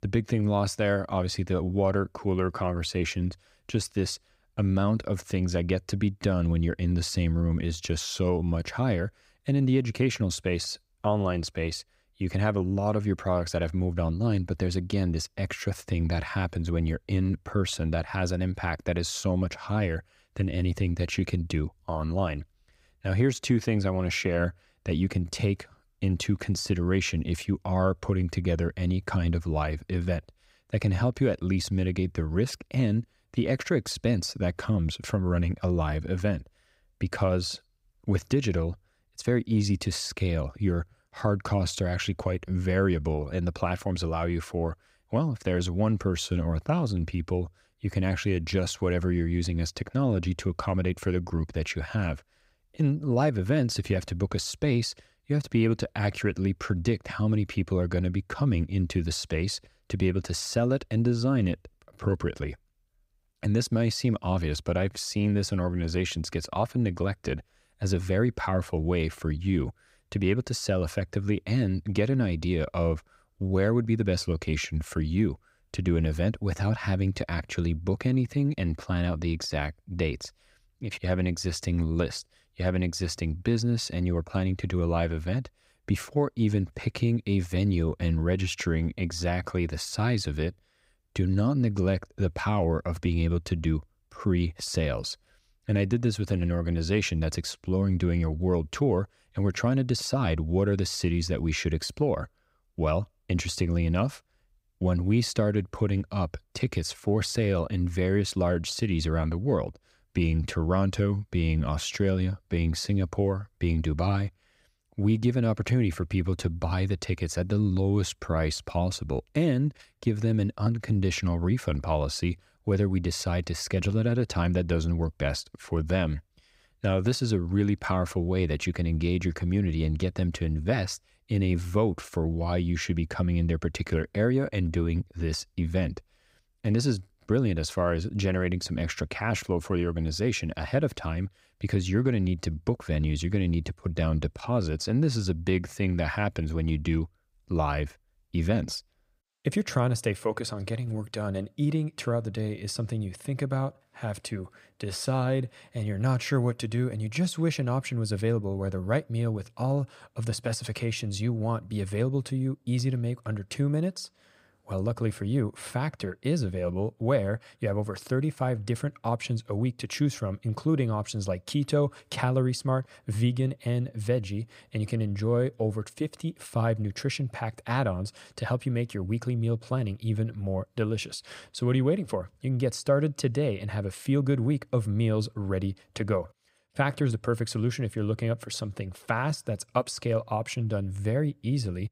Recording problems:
none

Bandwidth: 15.5 kHz